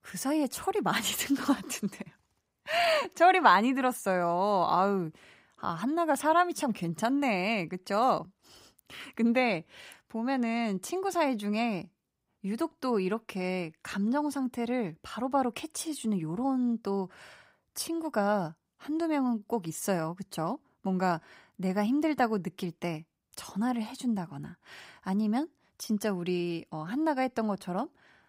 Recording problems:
none

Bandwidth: 15.5 kHz